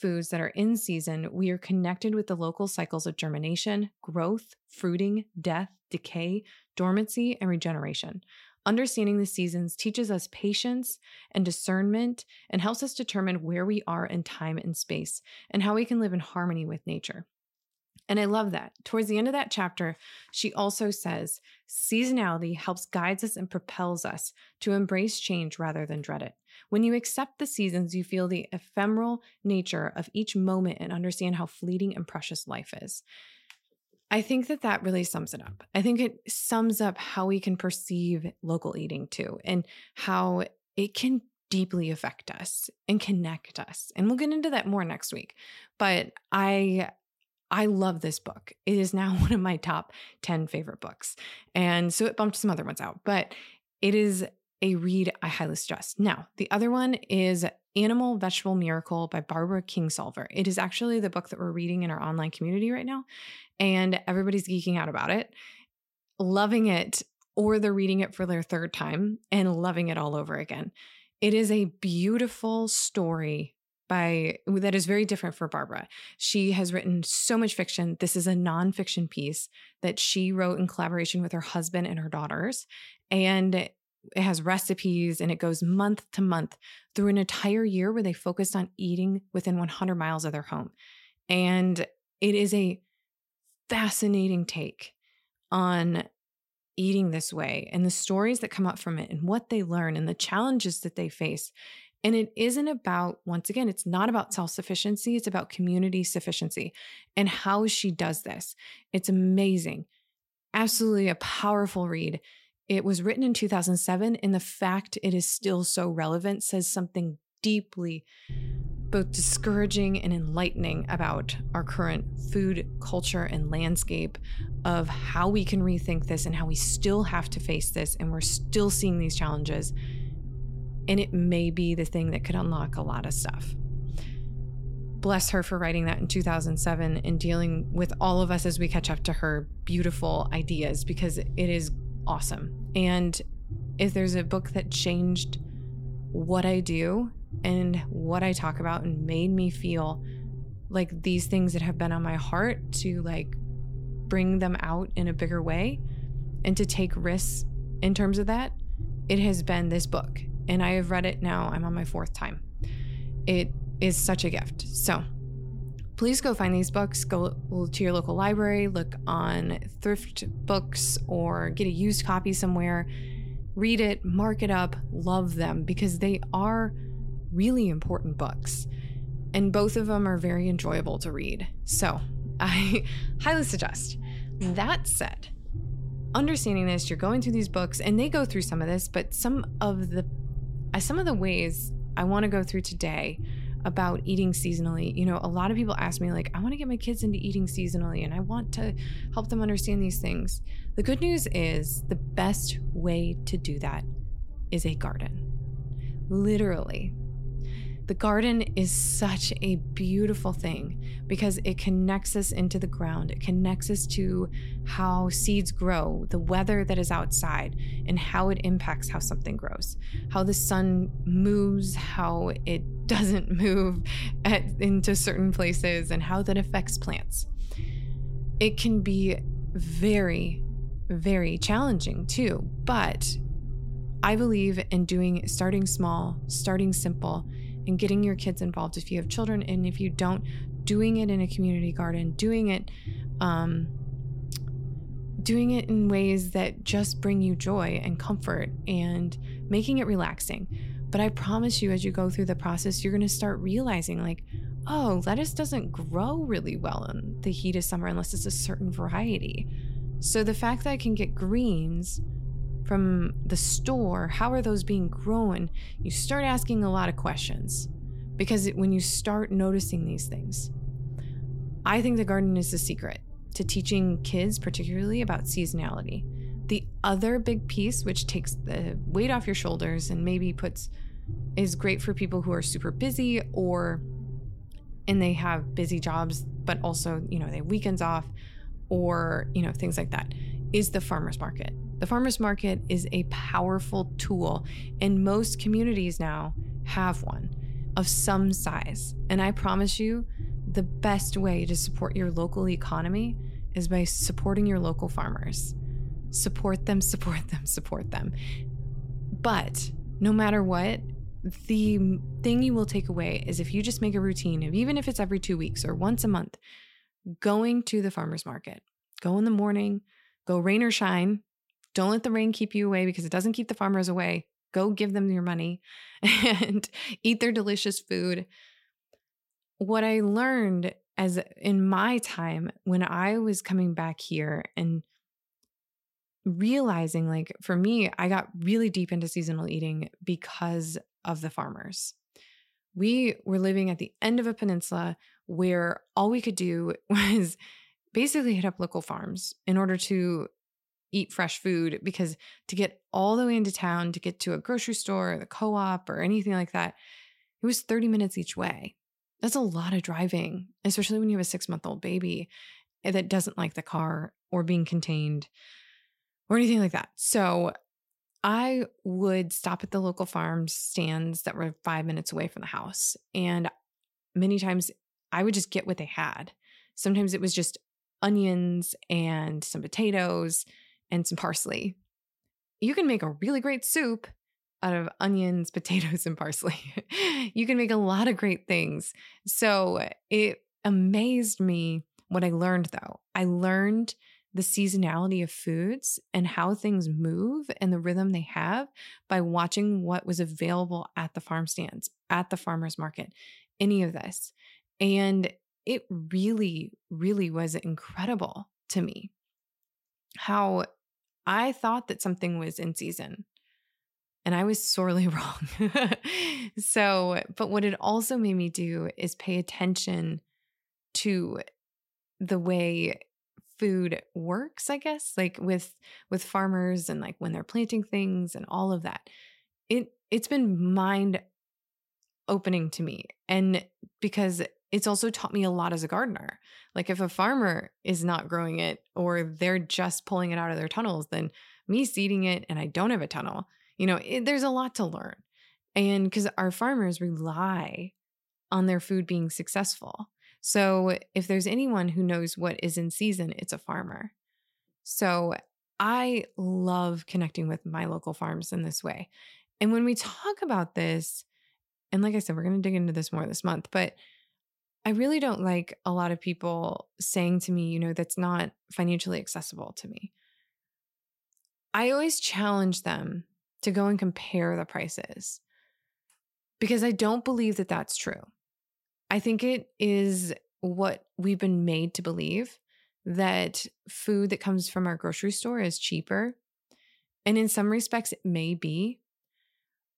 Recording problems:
low rumble; noticeable; from 1:58 to 5:16; 20 dB below the speech

